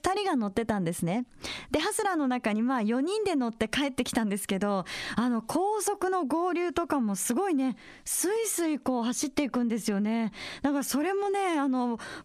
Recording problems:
squashed, flat; heavily

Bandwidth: 14.5 kHz